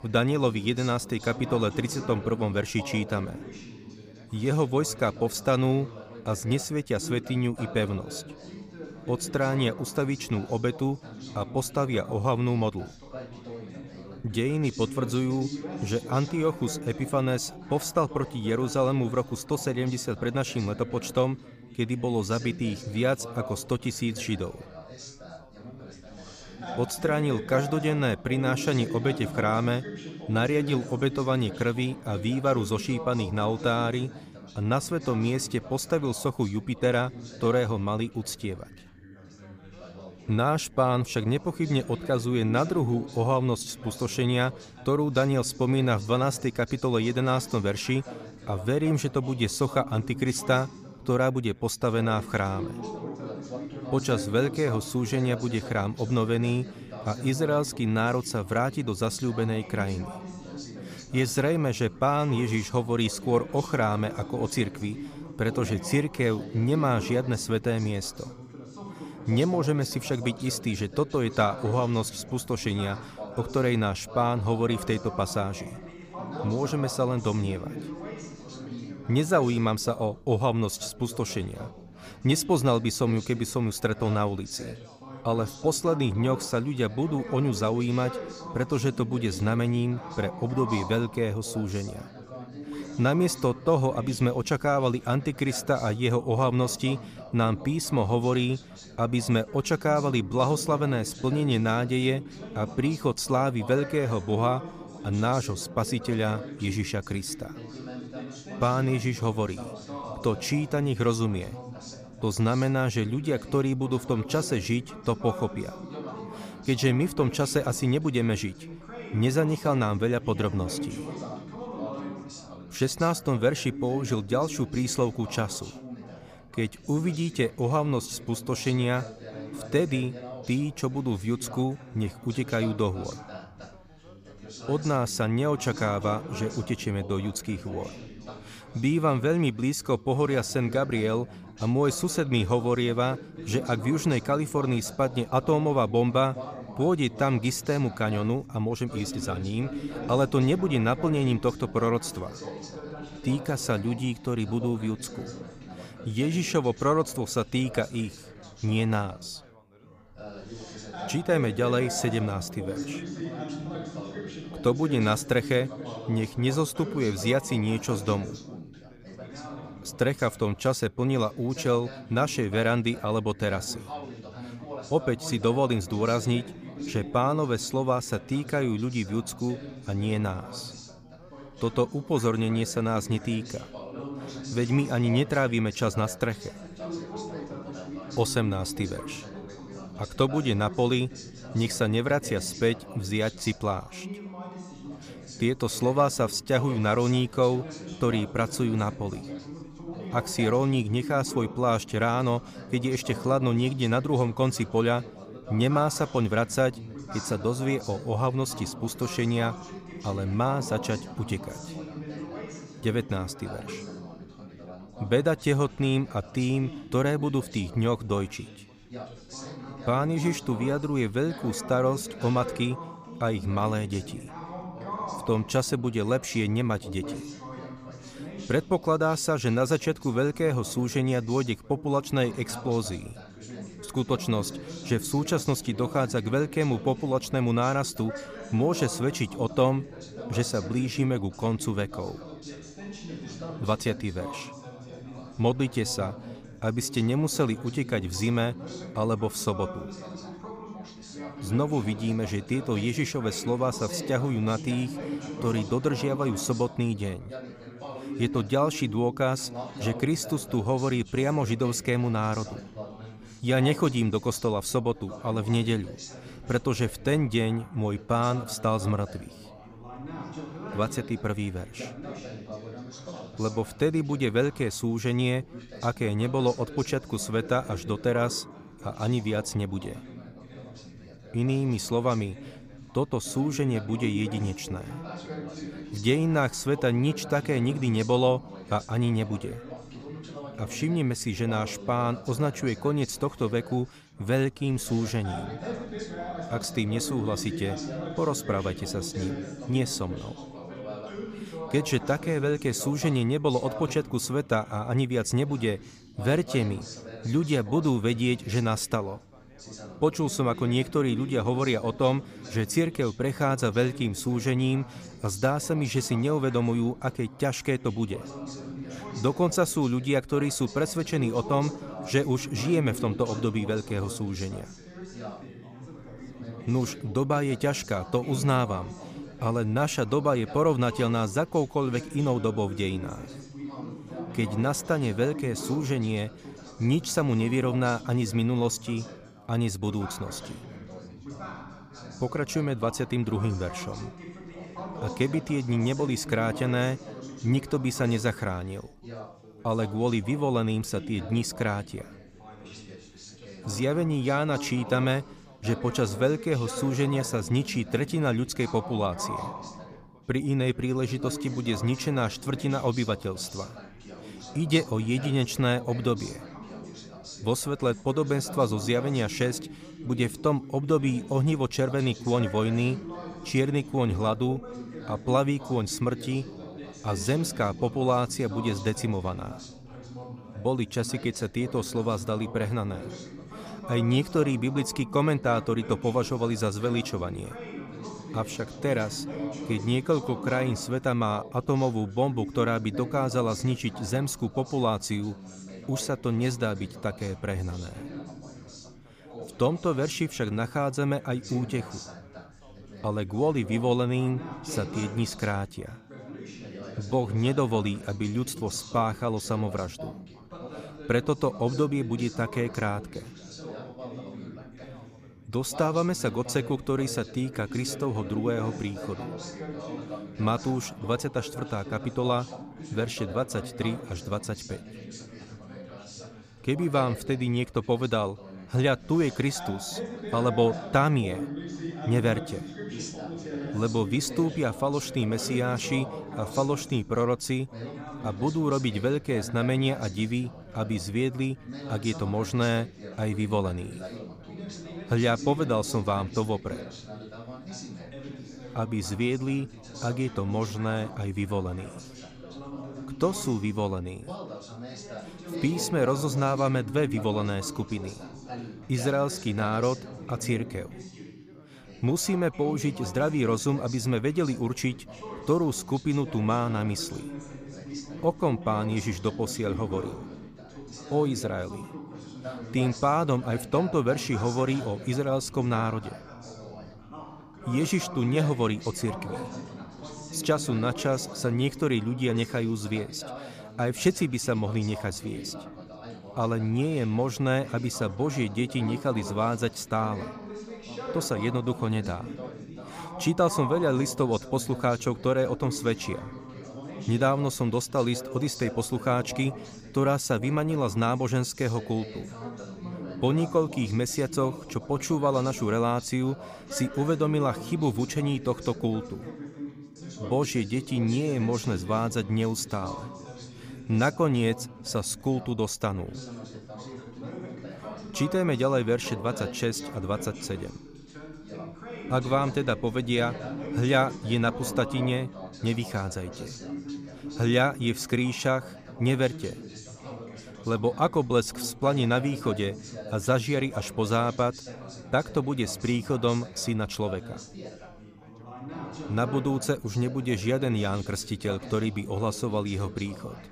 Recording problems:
background chatter; noticeable; throughout; 3 voices, 15 dB below the speech

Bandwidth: 15 kHz